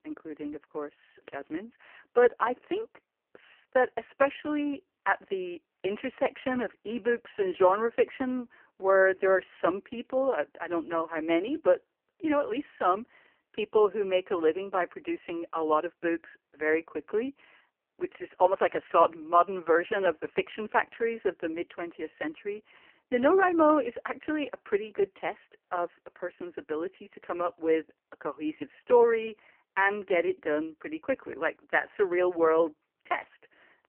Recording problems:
phone-call audio; poor line; nothing above 3 kHz

